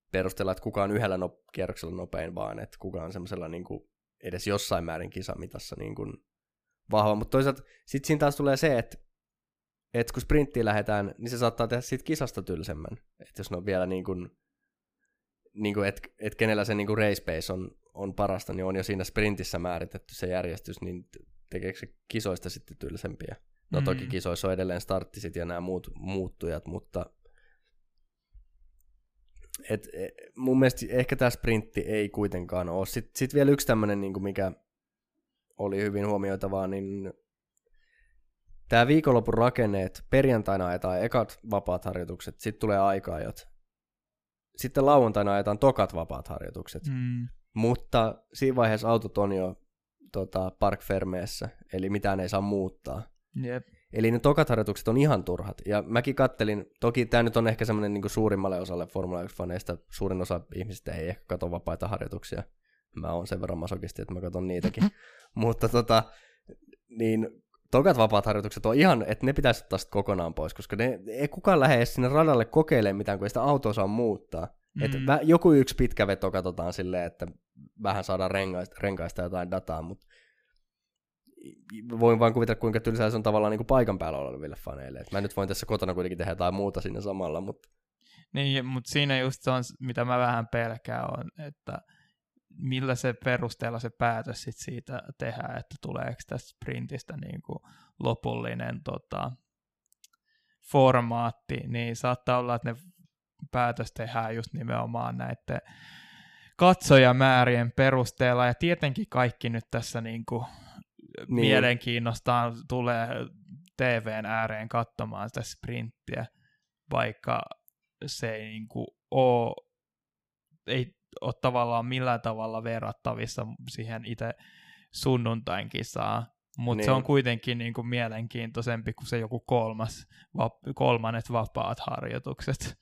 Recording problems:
none

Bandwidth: 15 kHz